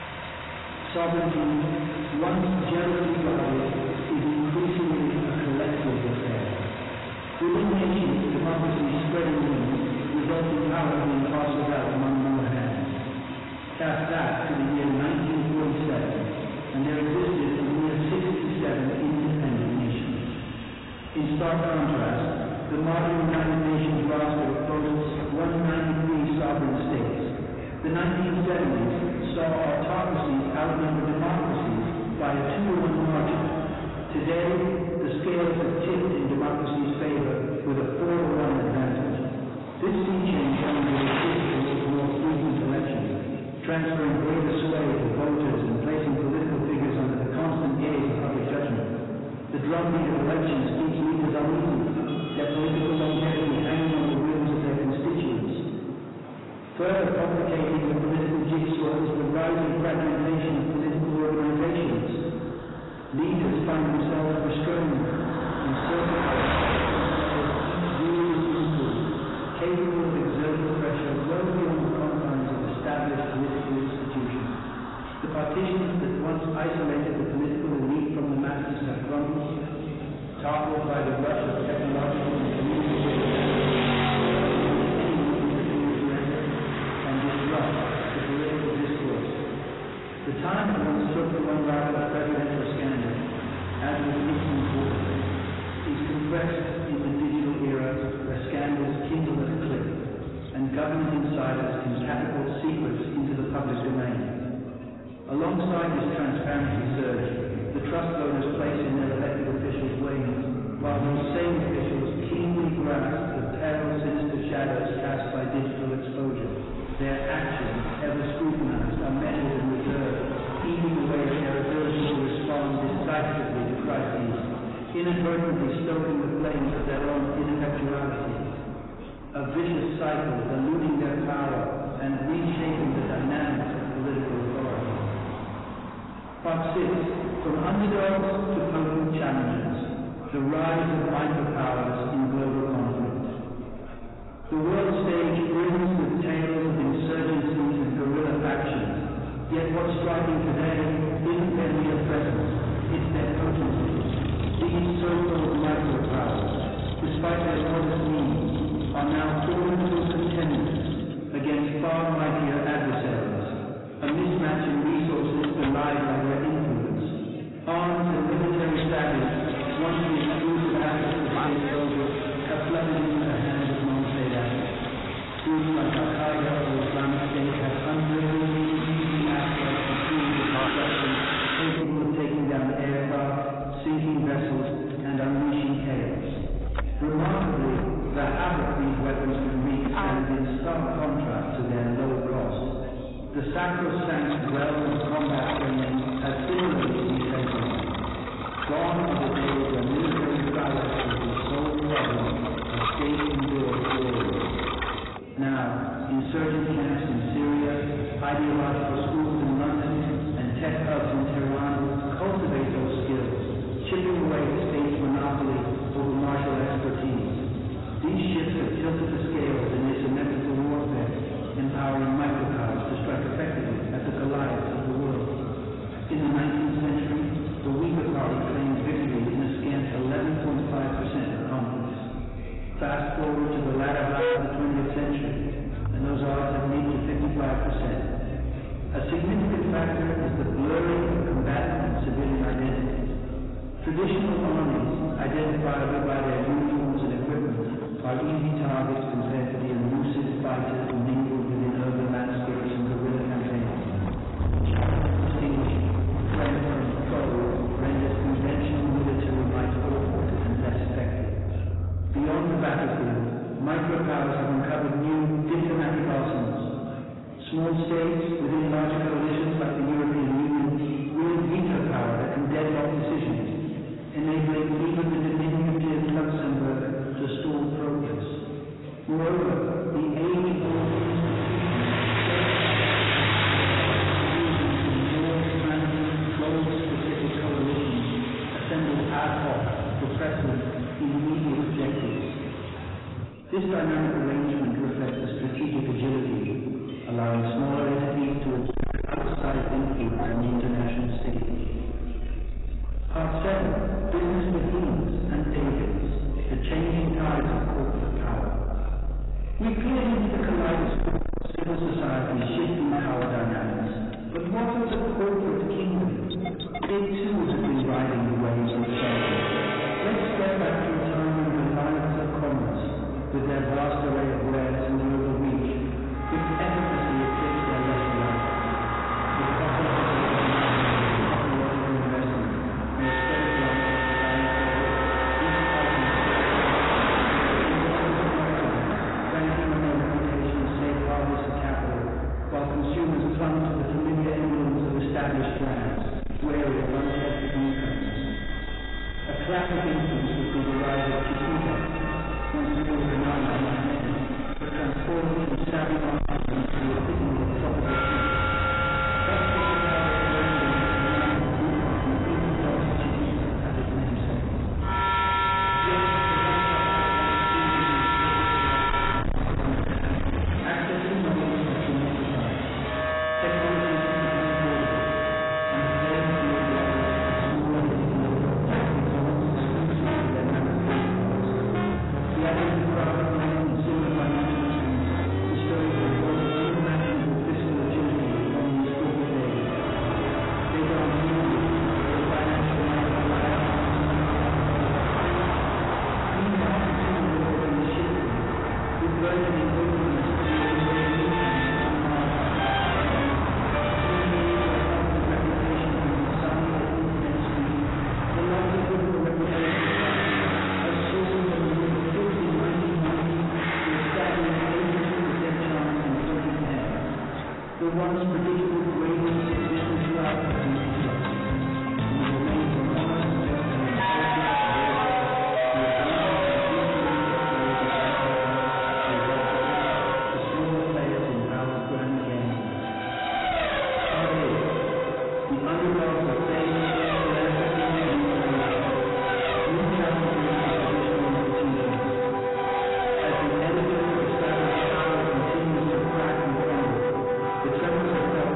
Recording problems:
distortion; heavy; 8 dB below the speech
off-mic speech; far
garbled, watery; badly; nothing above 4 kHz
room echo; noticeable; dies away in 2.2 s
traffic noise; loud; throughout; 4 dB below the speech
background music; loud; from 5:19 on; 1 dB below the speech
chatter from many people; noticeable; throughout; 20 dB below the speech

